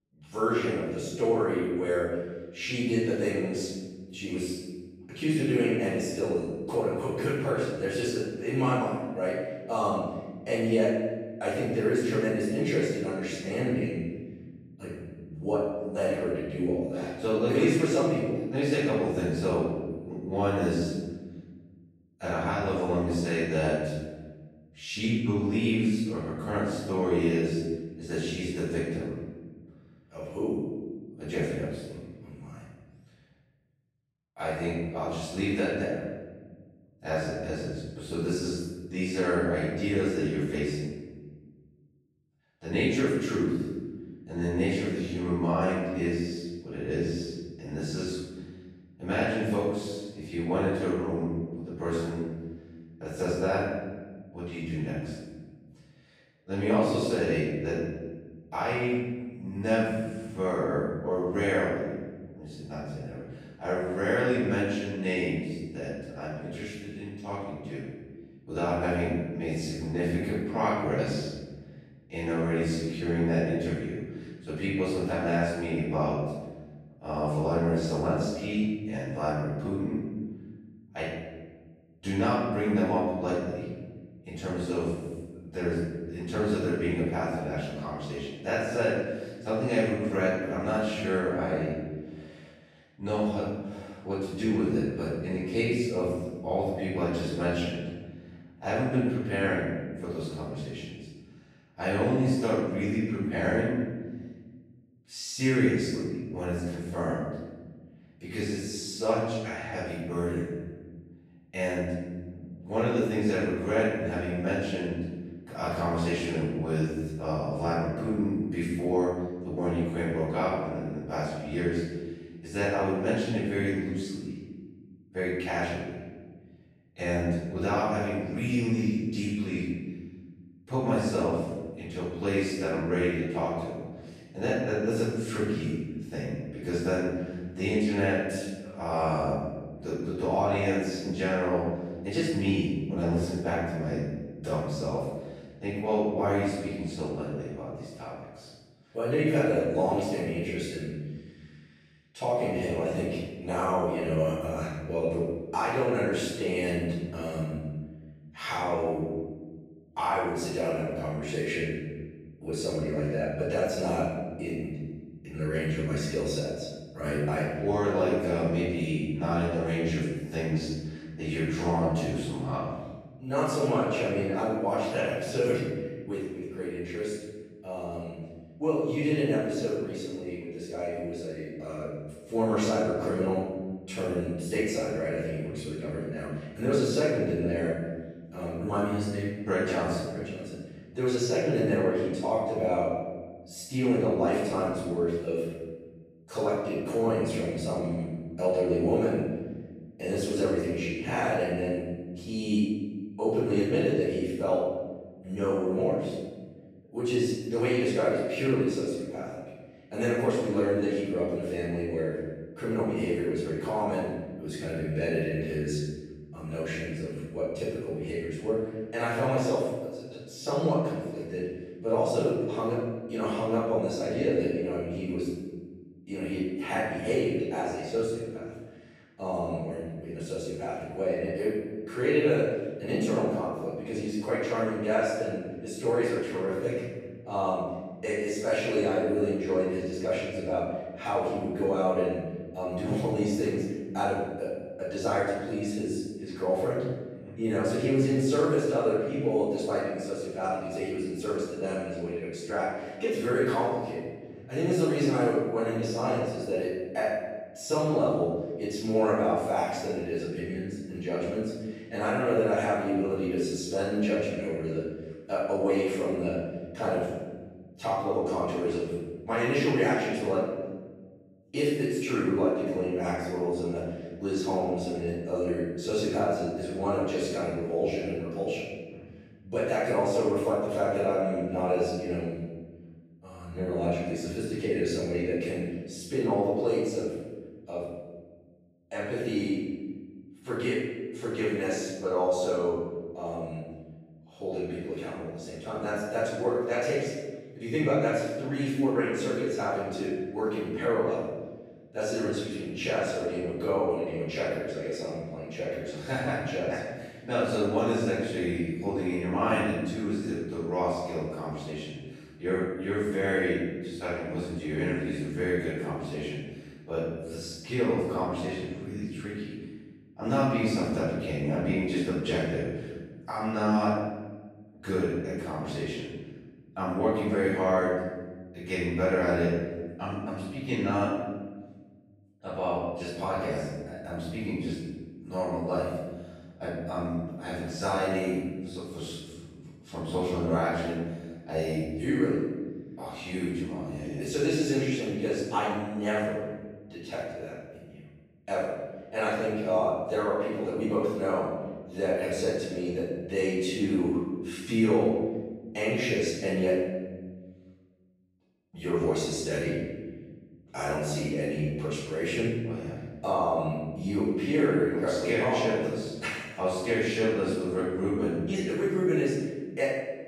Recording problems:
room echo; strong; dies away in 1.4 s
off-mic speech; far

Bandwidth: 14 kHz